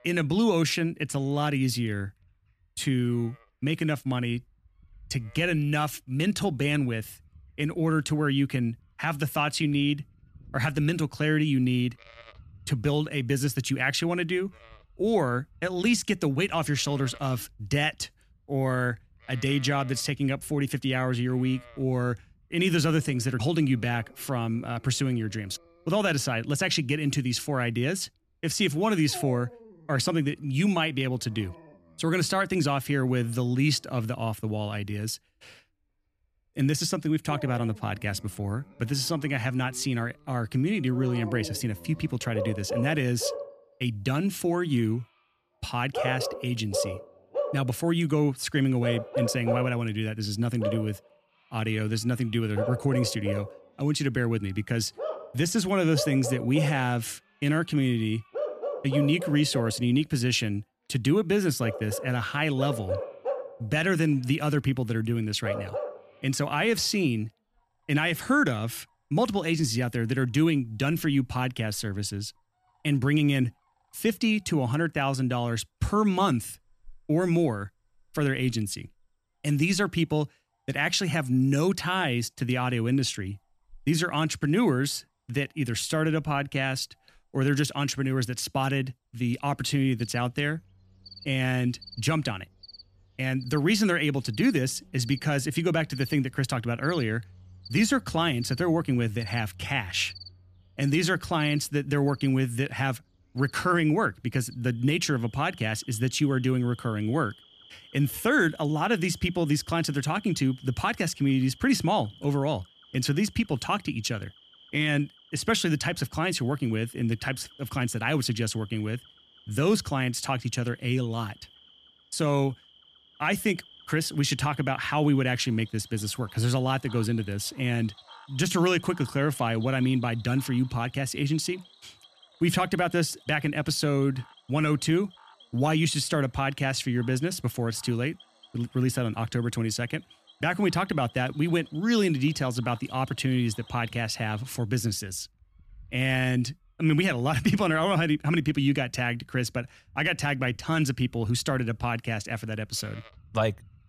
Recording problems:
animal sounds; noticeable; throughout; 15 dB below the speech

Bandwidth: 14.5 kHz